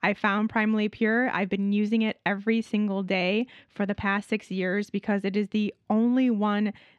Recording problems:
muffled; very slightly; fading above 3.5 kHz

